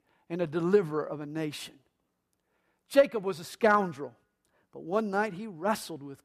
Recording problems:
none

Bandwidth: 14.5 kHz